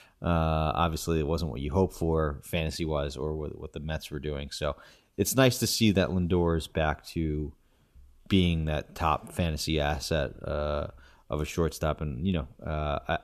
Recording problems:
none

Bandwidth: 14.5 kHz